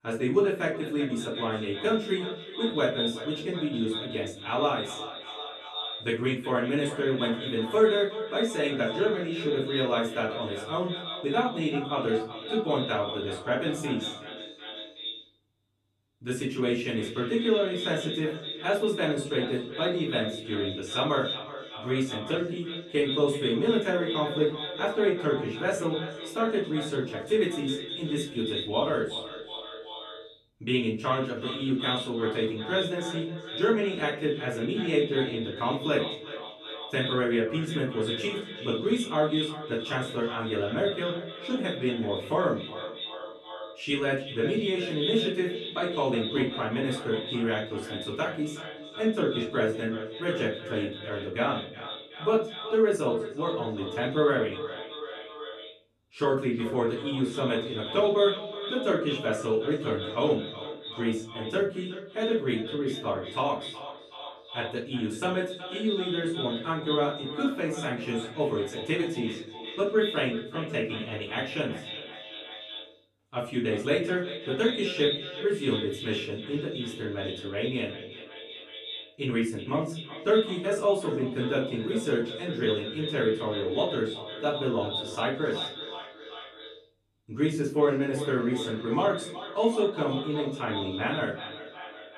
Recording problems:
echo of what is said; strong; throughout; 370 ms later, 8 dB below the speech
off-mic speech; far
room echo; slight; dies away in 0.5 s

